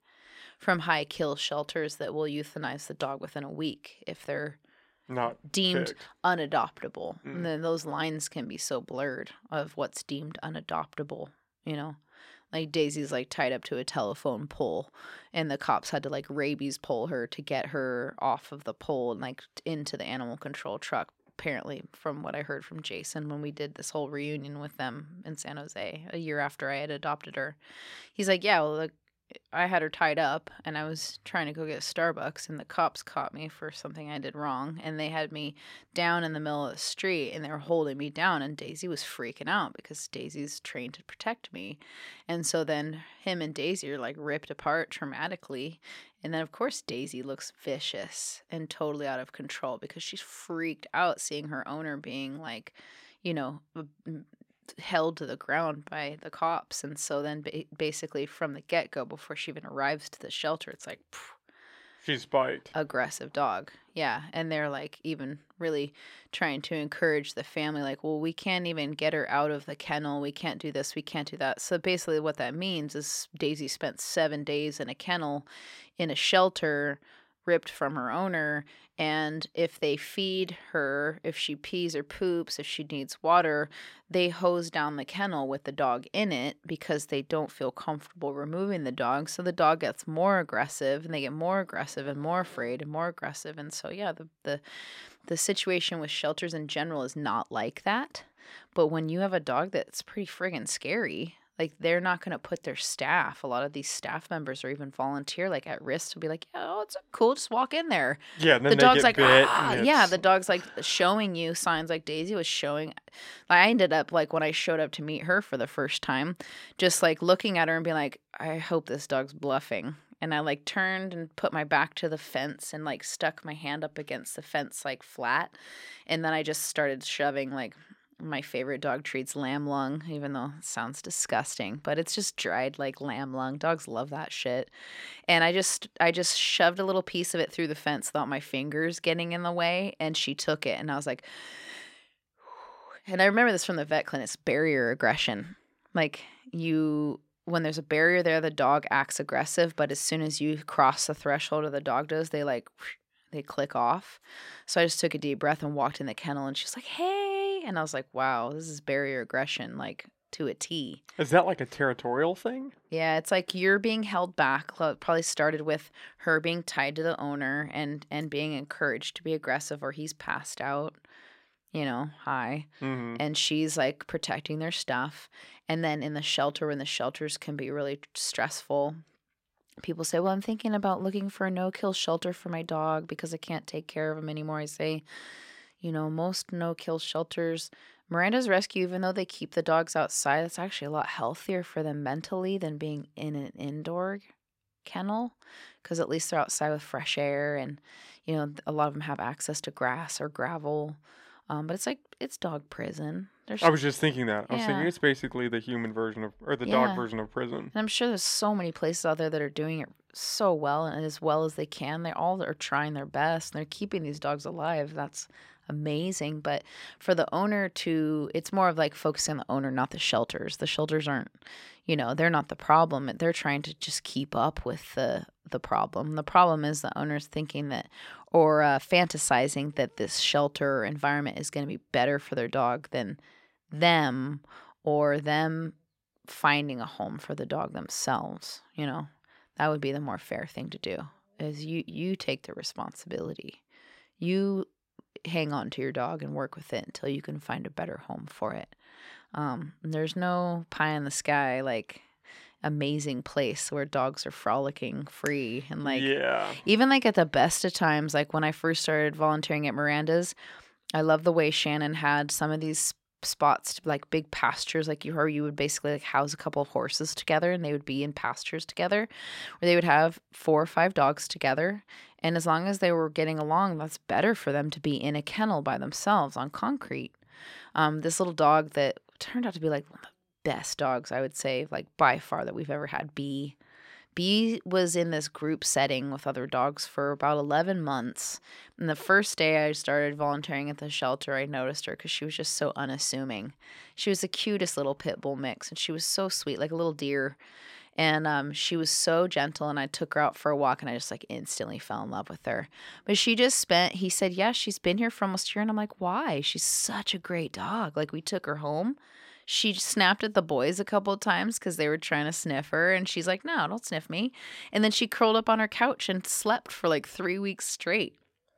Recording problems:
none

